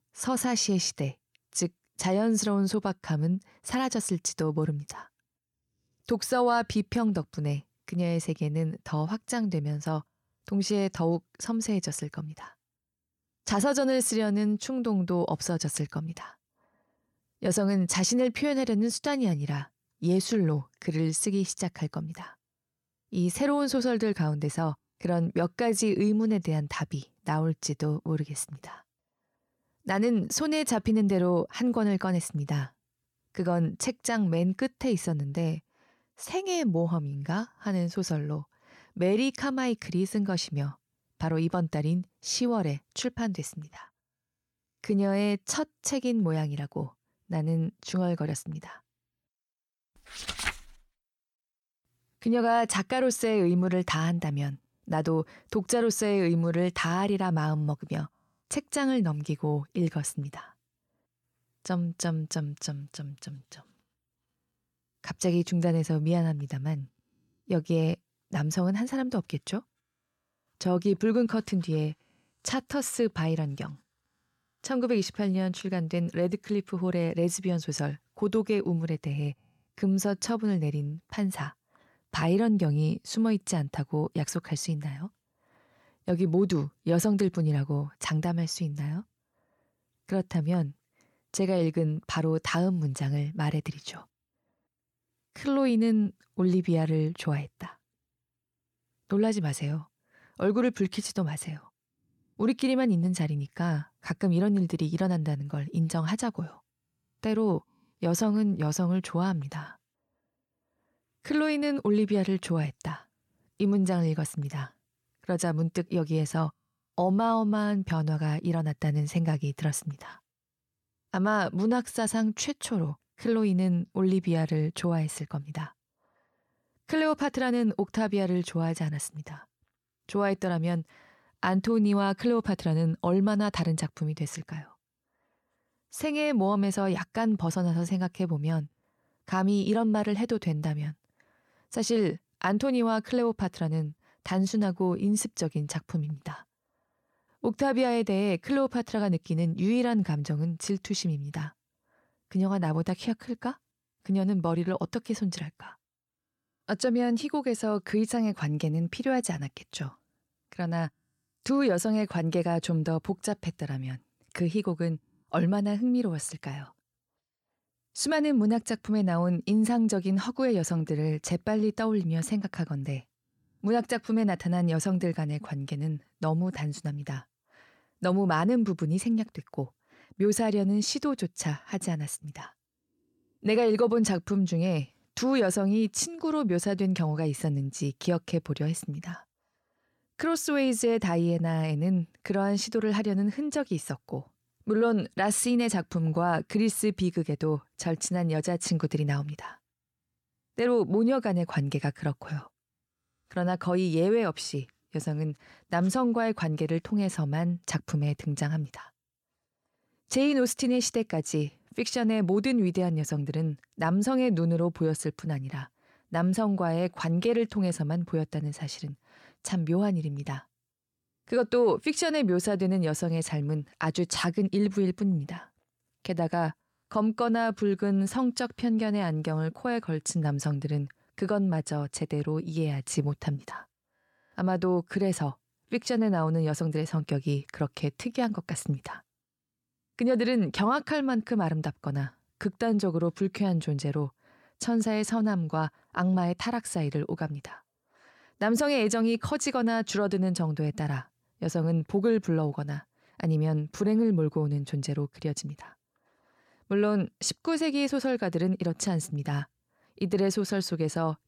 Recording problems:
none

